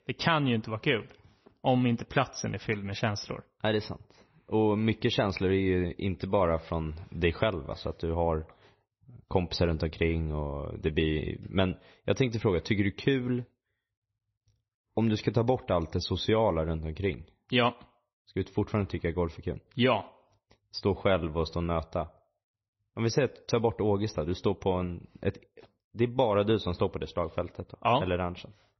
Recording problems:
garbled, watery; slightly; nothing above 6 kHz

